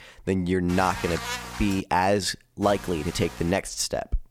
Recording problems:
electrical hum; loud; from 0.5 to 2 s and at 2.5 s; 60 Hz, 9 dB below the speech

